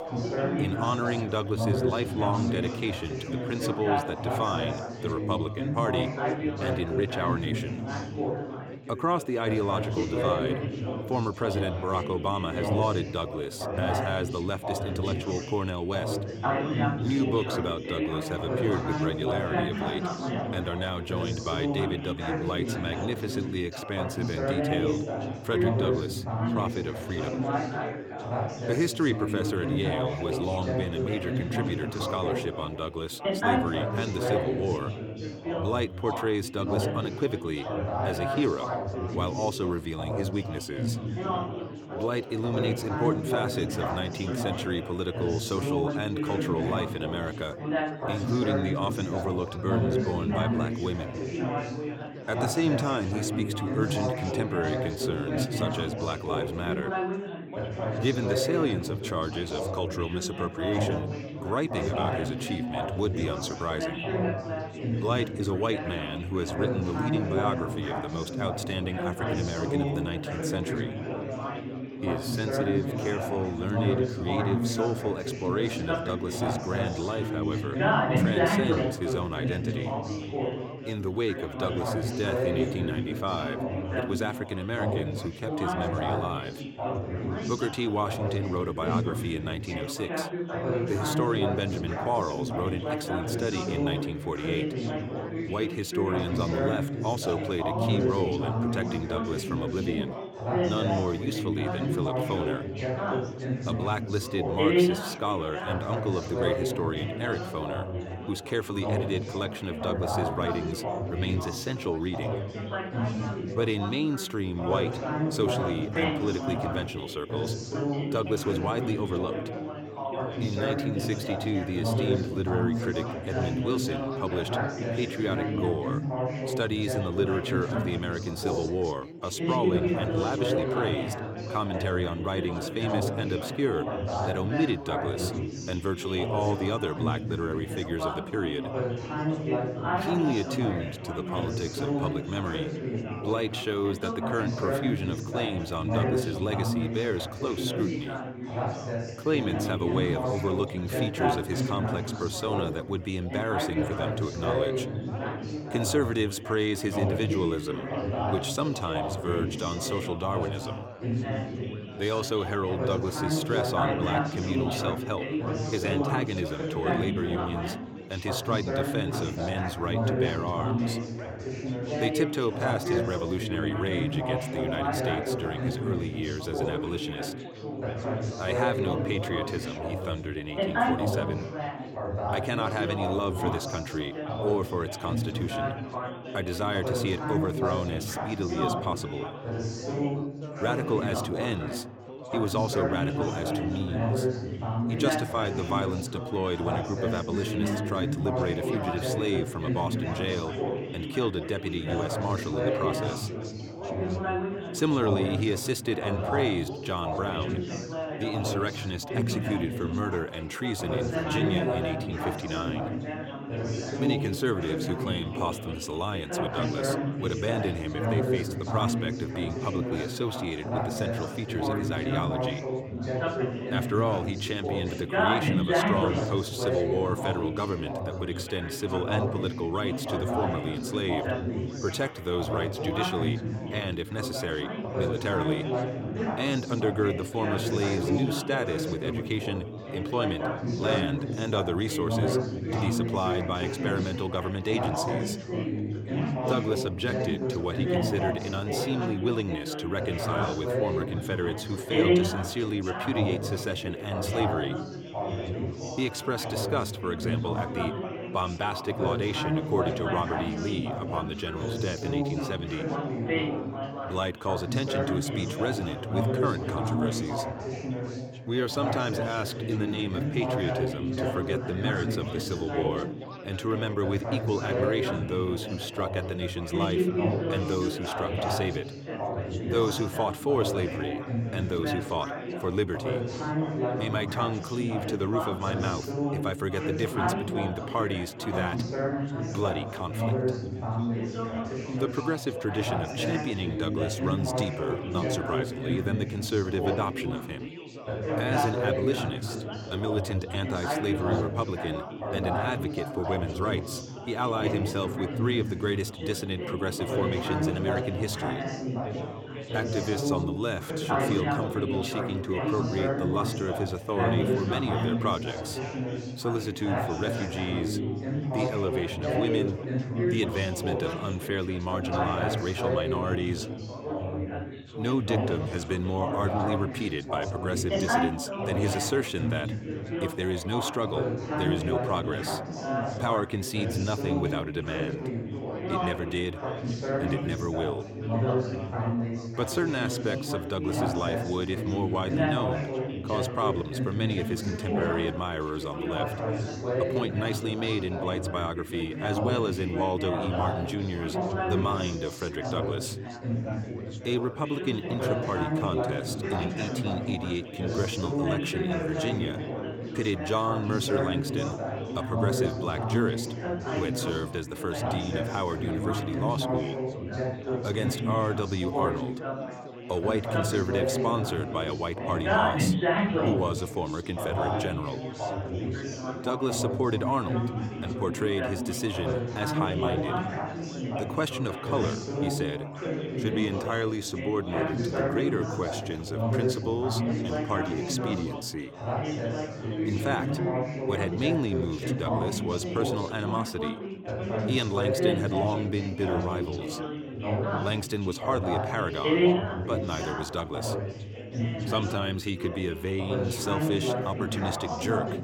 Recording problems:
chatter from many people; very loud; throughout; 1 dB above the speech

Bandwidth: 17 kHz